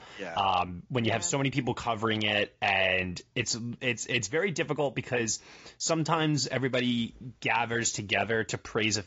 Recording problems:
high frequencies cut off; noticeable; nothing above 7.5 kHz
garbled, watery; slightly

